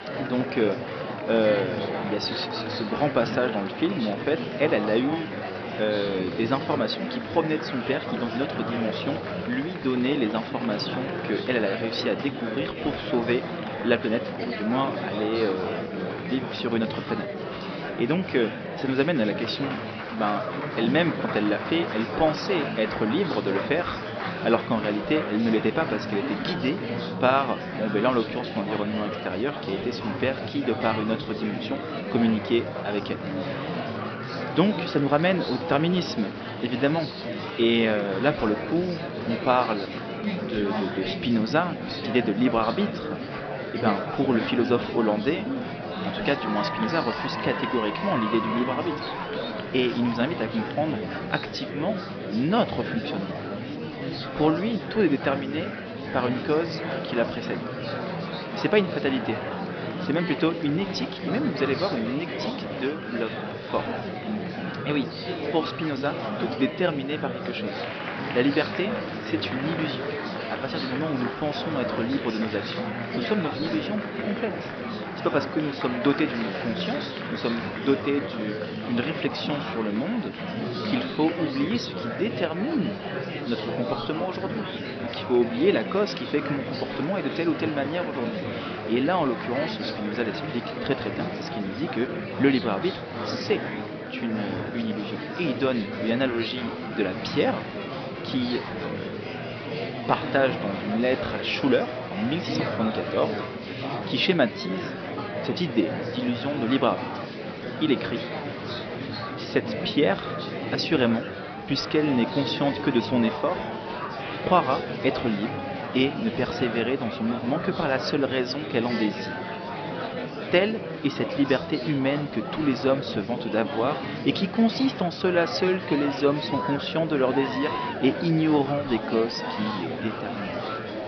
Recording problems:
high frequencies cut off; noticeable; nothing above 5.5 kHz
murmuring crowd; loud; throughout; 5 dB below the speech

